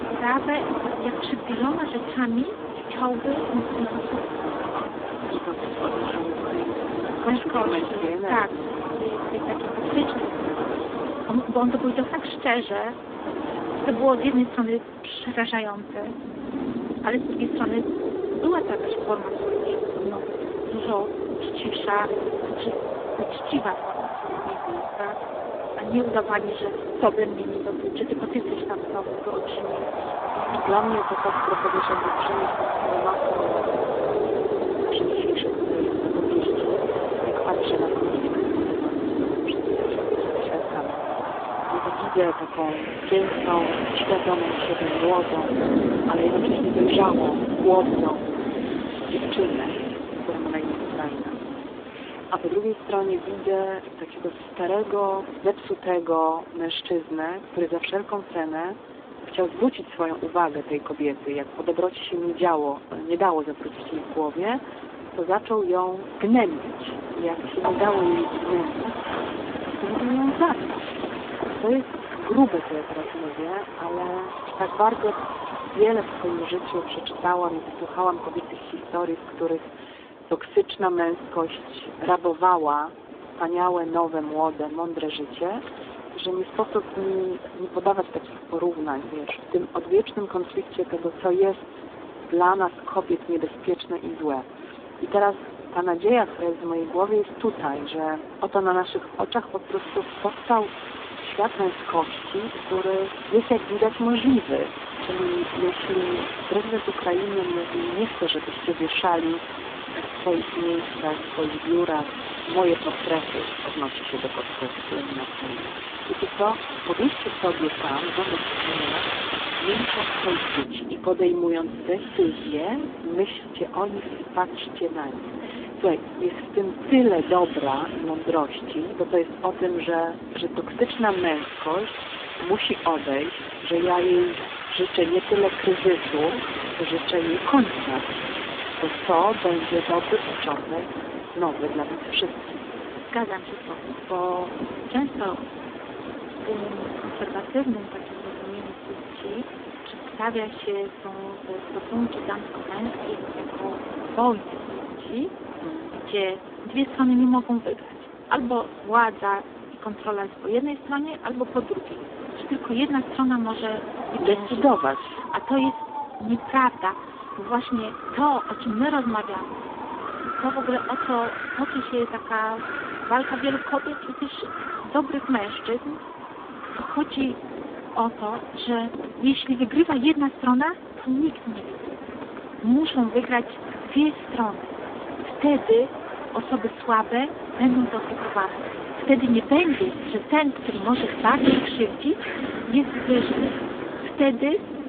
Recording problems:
phone-call audio; poor line
wind in the background; loud; throughout; 5 dB below the speech

